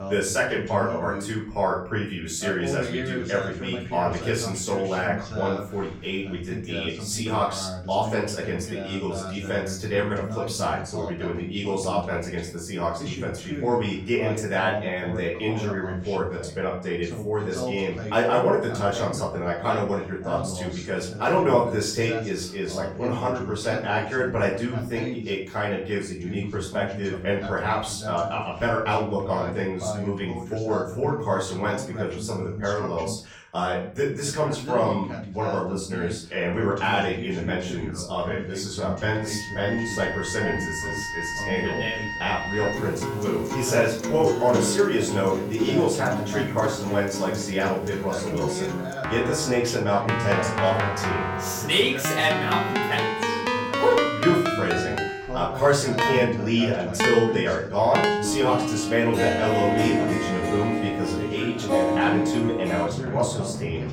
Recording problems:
off-mic speech; far
room echo; slight; dies away in 0.4 s
background music; loud; from 39 s on; 2 dB below the speech
voice in the background; loud; throughout; 9 dB below the speech

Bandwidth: 17.5 kHz